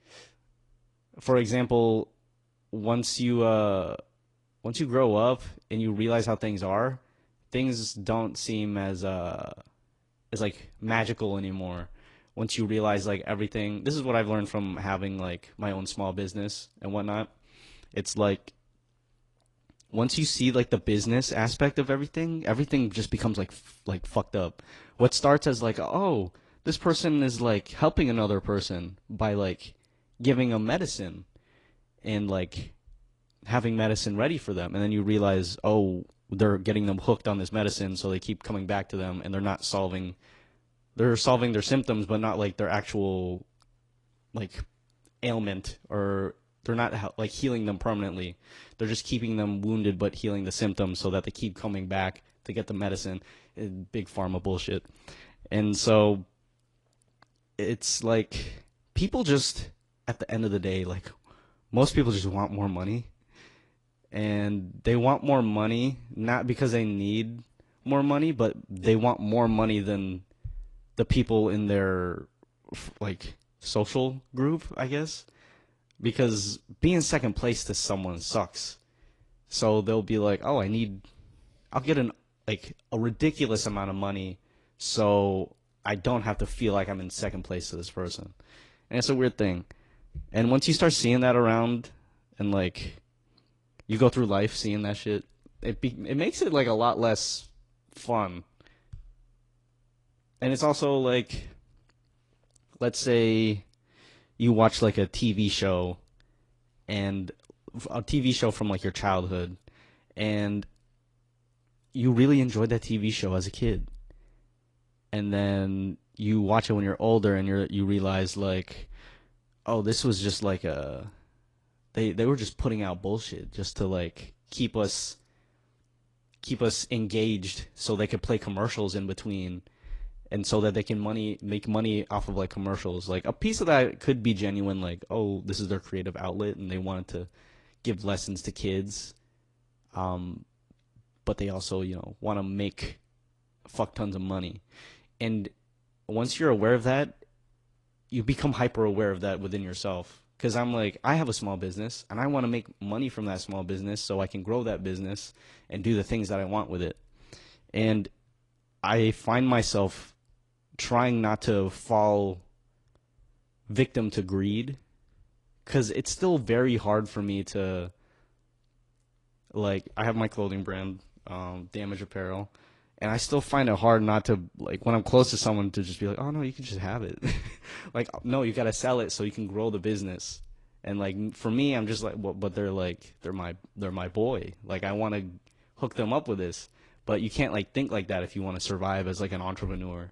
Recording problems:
garbled, watery; slightly

